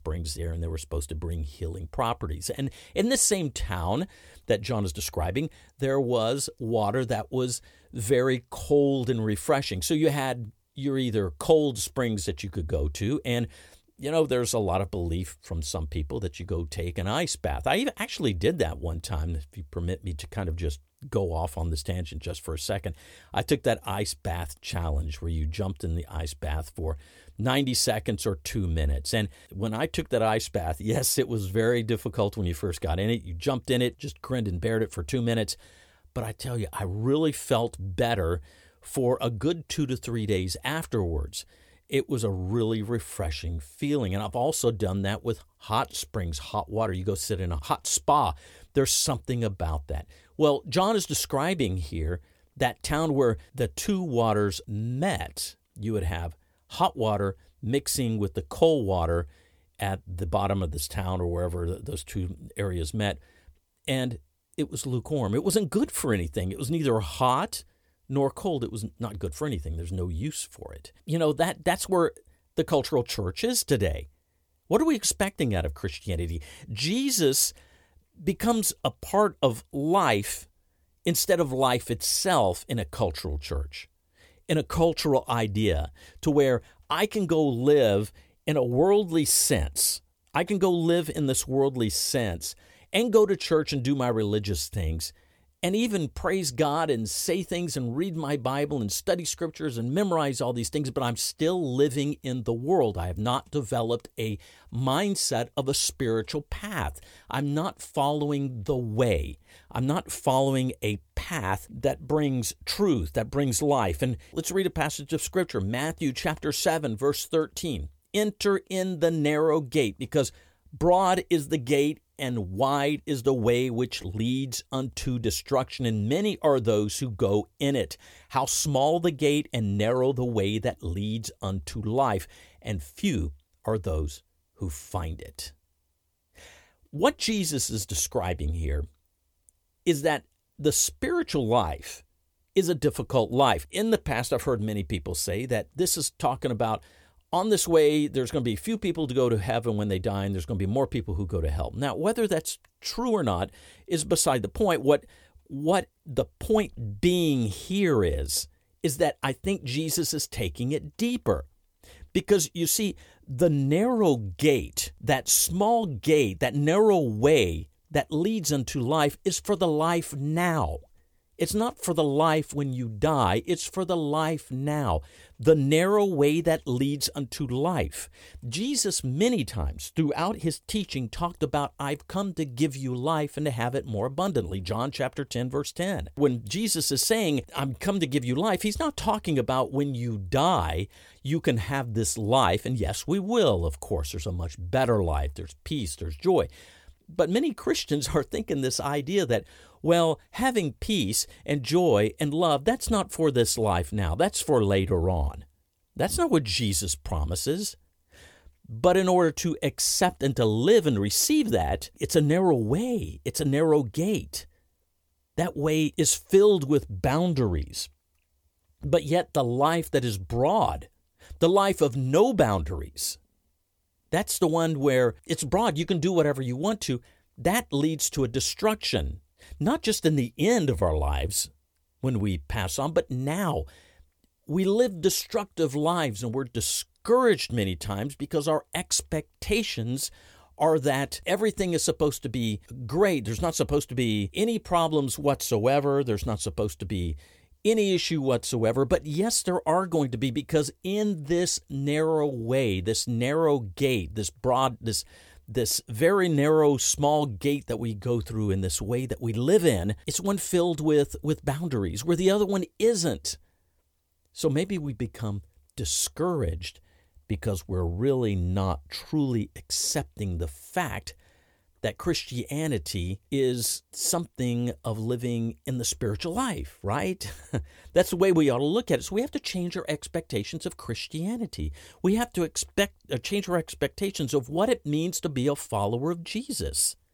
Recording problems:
none

